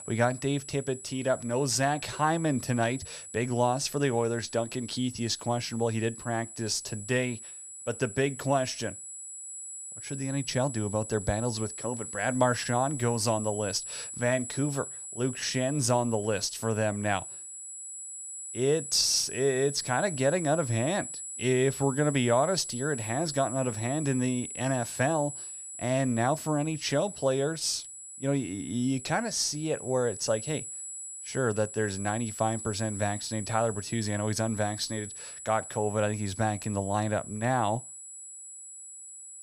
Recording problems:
high-pitched whine; loud; throughout; 7.5 kHz, 9 dB below the speech

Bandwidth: 14 kHz